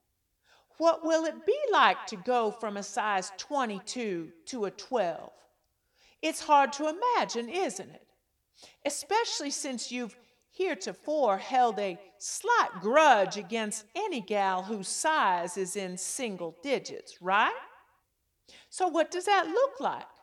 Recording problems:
echo of what is said; faint; throughout; 170 ms later, 20 dB below the speech

